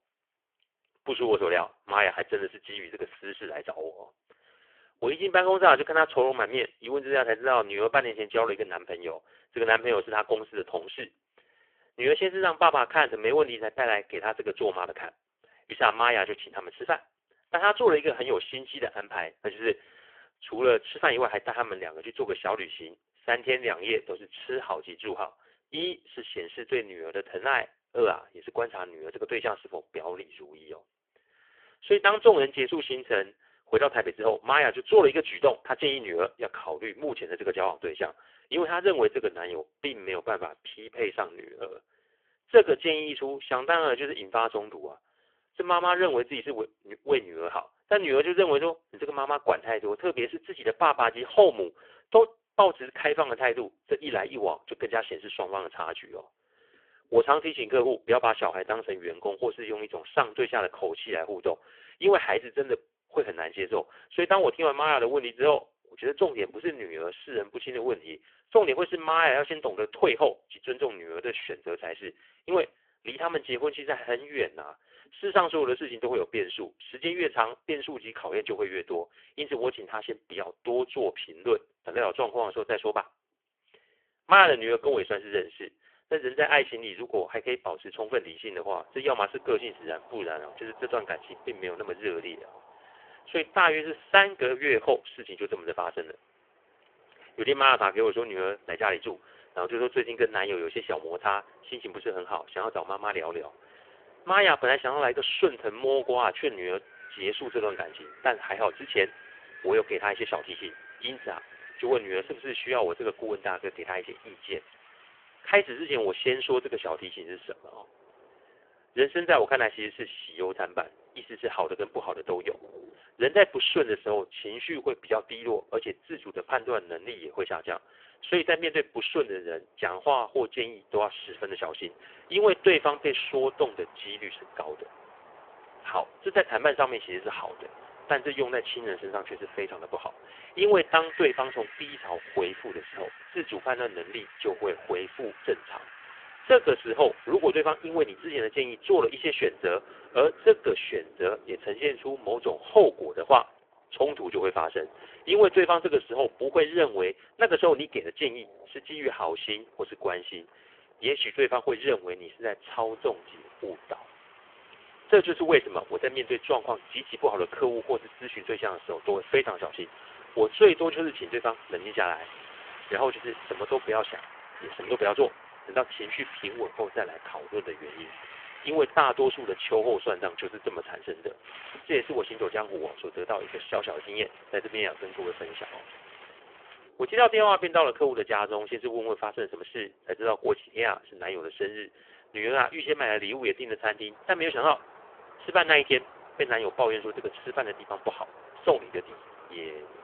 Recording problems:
phone-call audio; poor line; nothing above 3 kHz
wind in the background; faint; from 1:29 on; 20 dB below the speech

